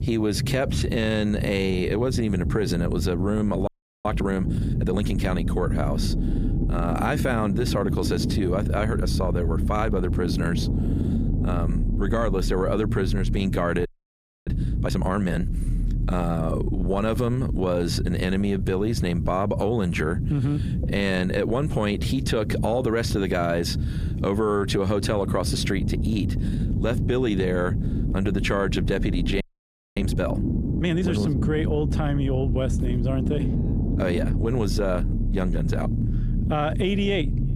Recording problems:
squashed, flat; somewhat
low rumble; loud; throughout; 10 dB below the speech
audio freezing; at 3.5 s, at 14 s for 0.5 s and at 29 s for 0.5 s

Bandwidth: 15 kHz